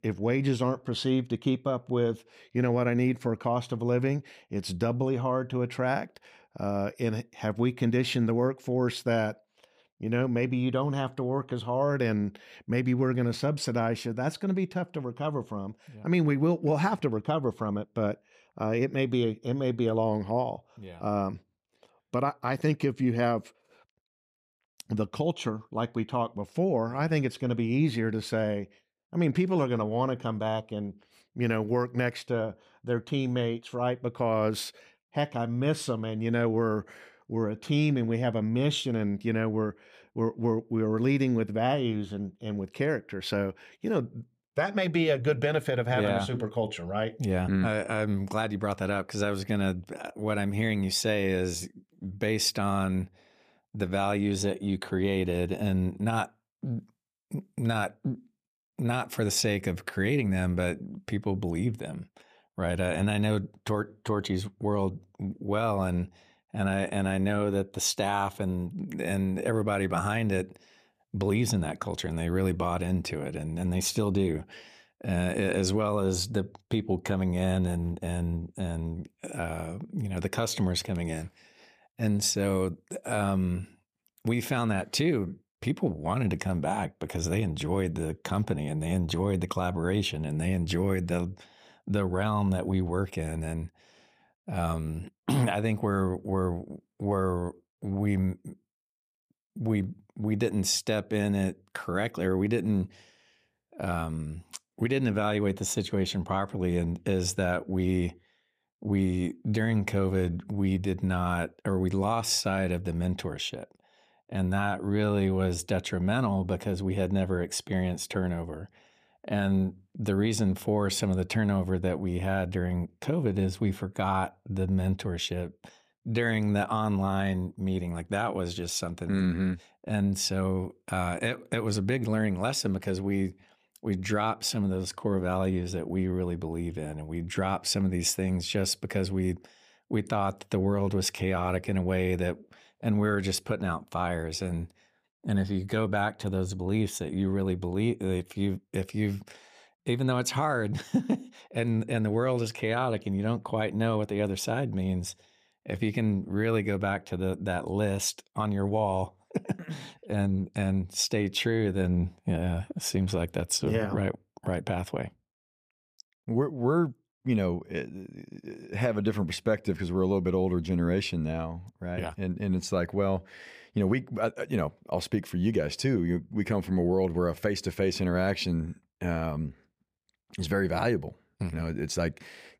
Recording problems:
none

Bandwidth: 15 kHz